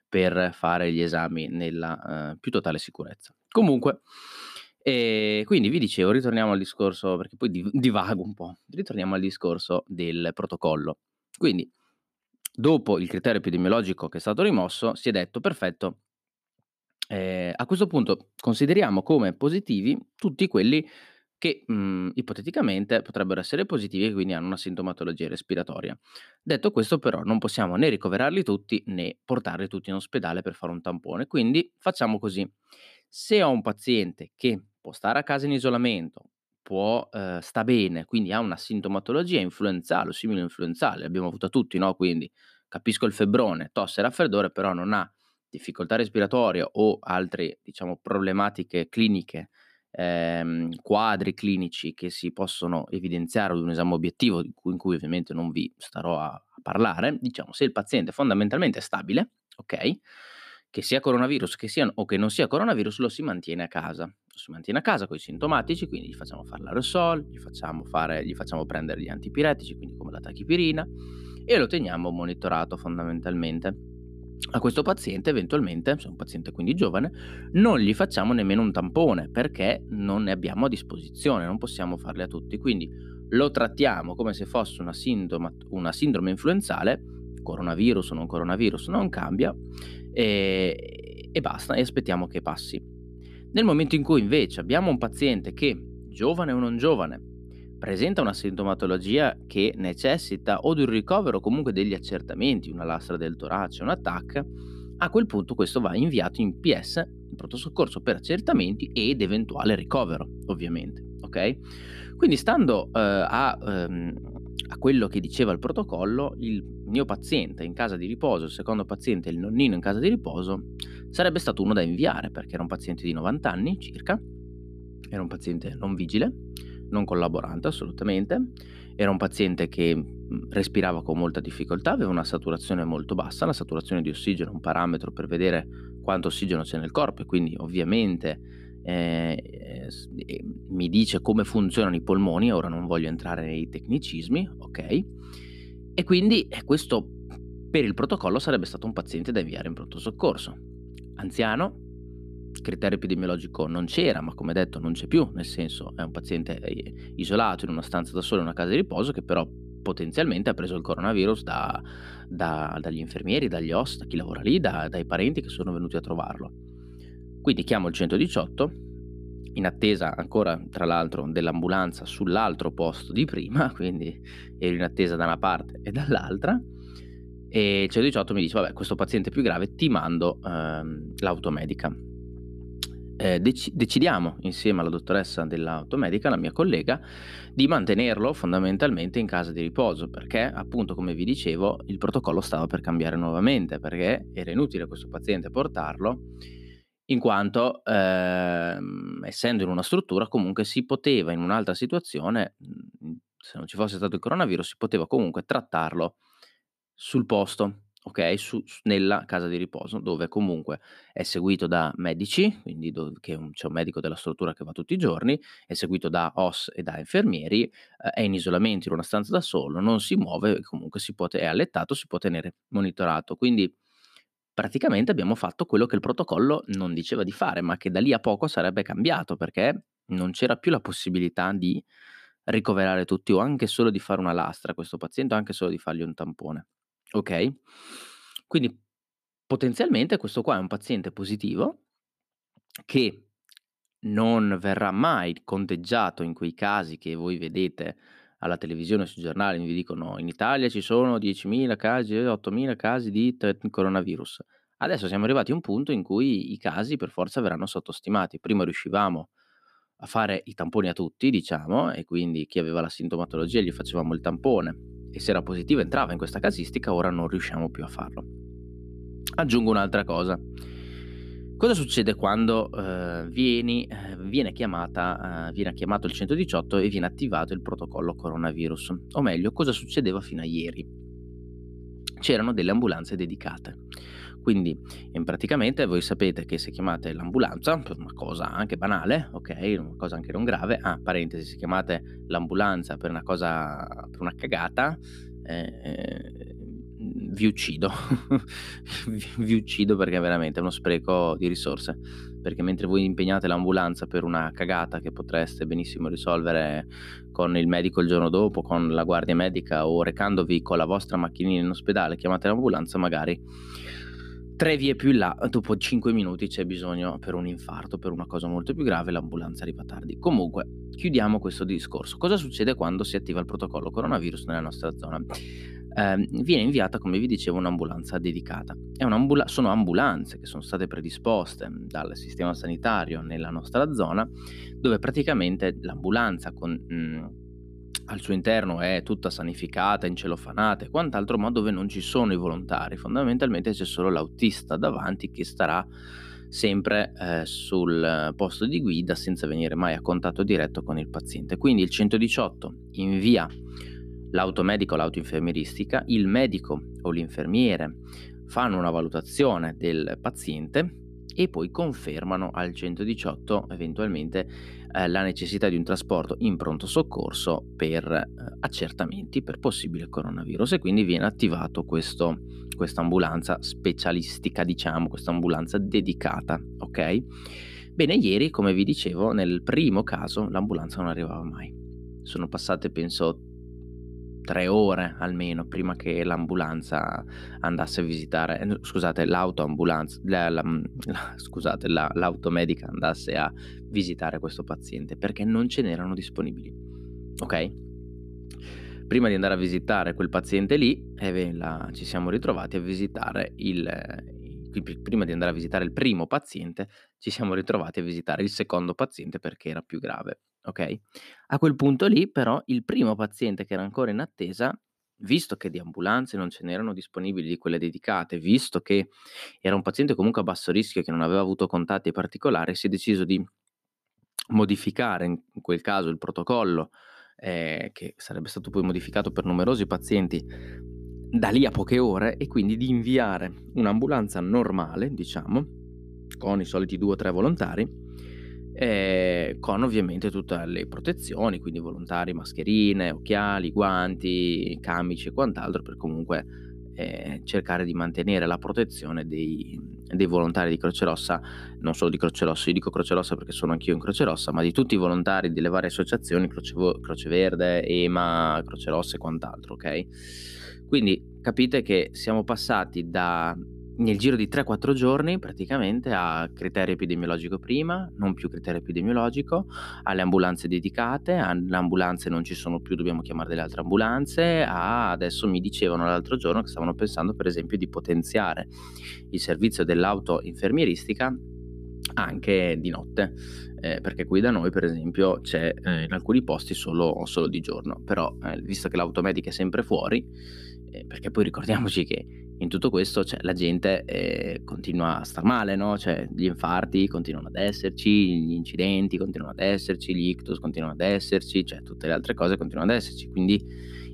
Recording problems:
electrical hum; faint; from 1:05 to 3:17, from 4:23 to 6:46 and from 7:09 on; 60 Hz, 25 dB below the speech

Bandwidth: 14.5 kHz